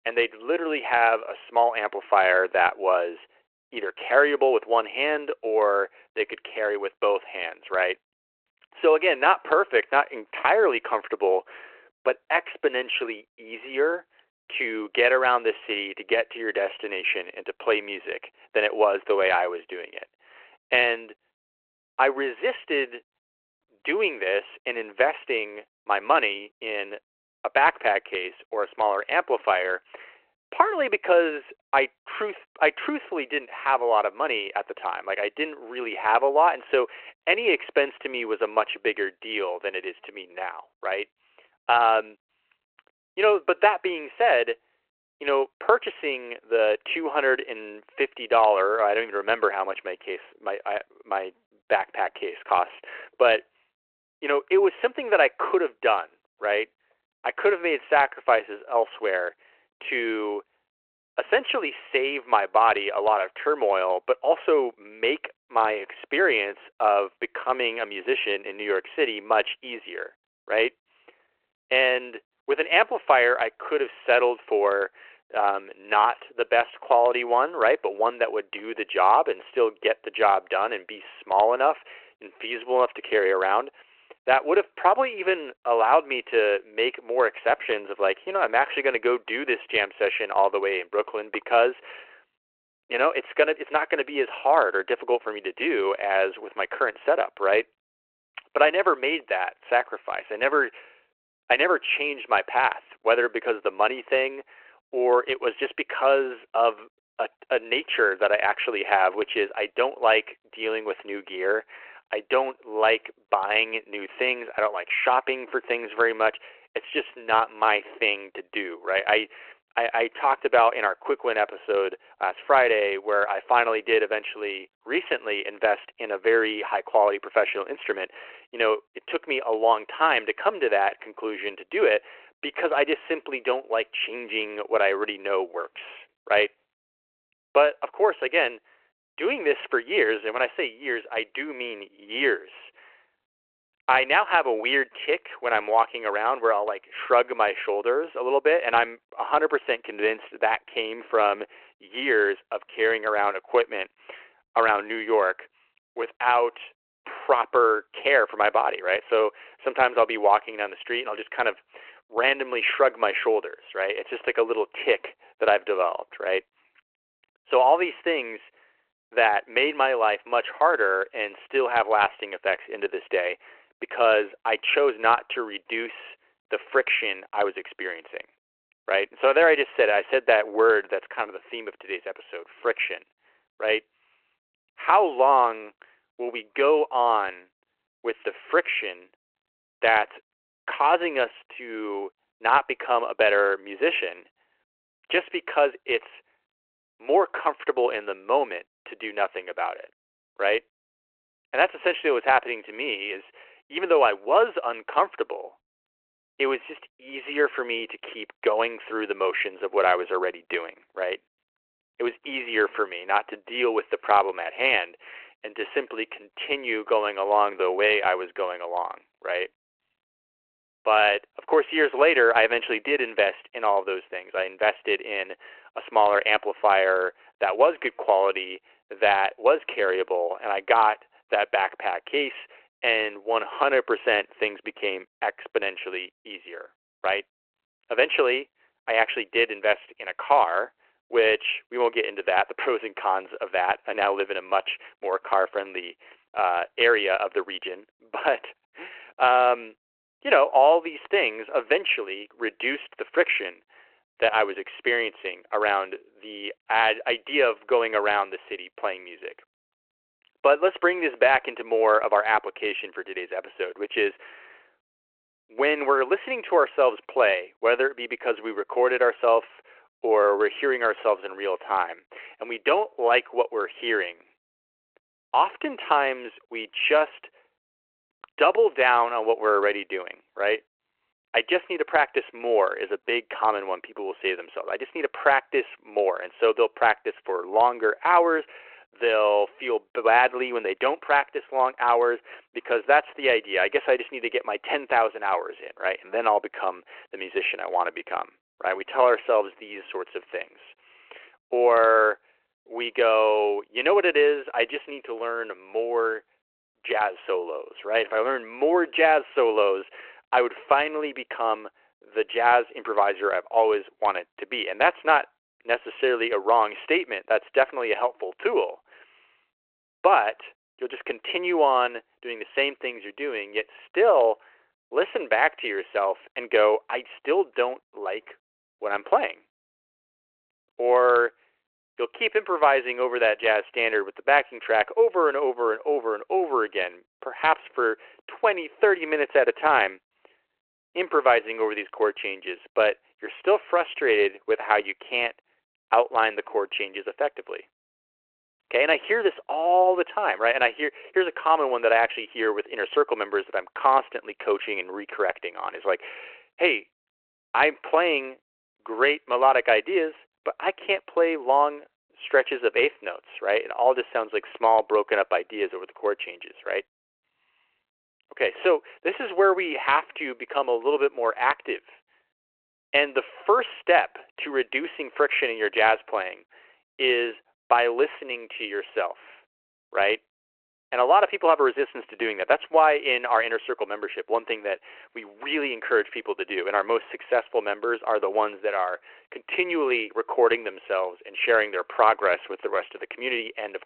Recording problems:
phone-call audio

